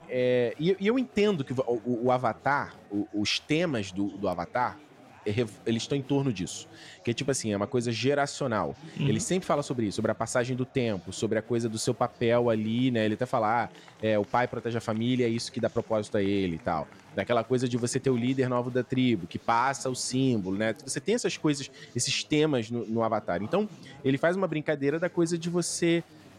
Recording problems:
chatter from many people; faint; throughout; 25 dB below the speech

